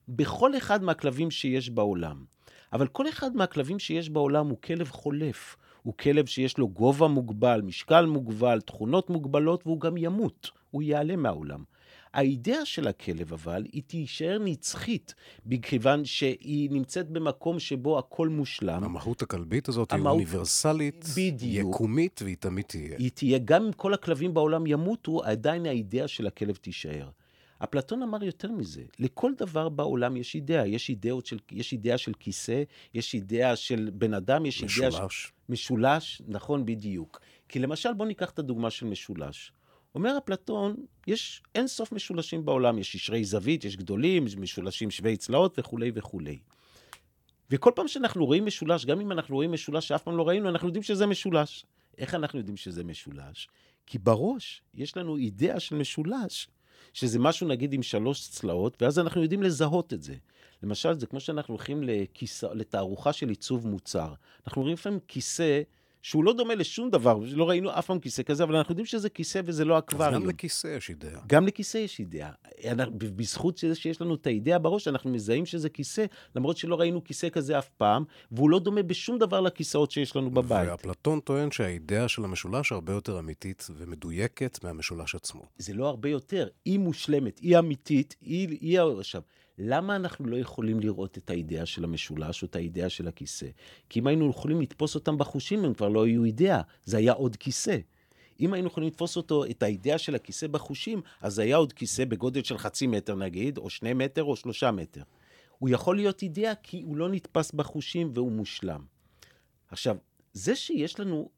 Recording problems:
none

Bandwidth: 18 kHz